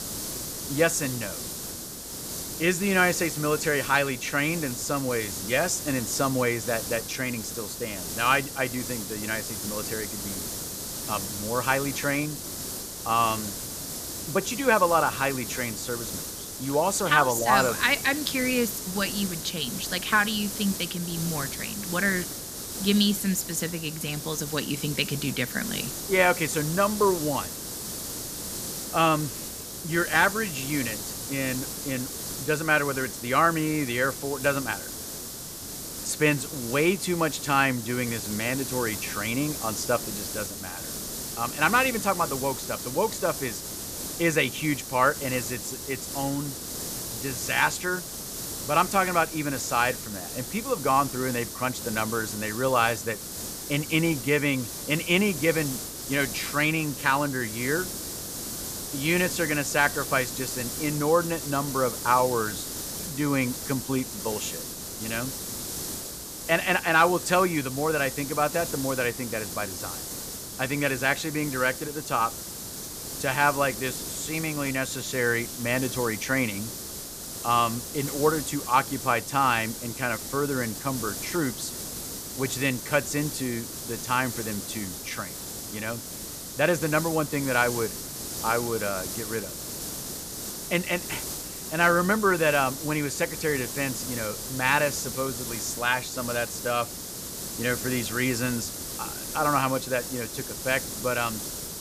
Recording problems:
hiss; loud; throughout; 6 dB below the speech

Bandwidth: 14.5 kHz